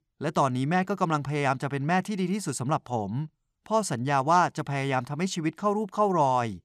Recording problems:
none

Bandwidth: 14.5 kHz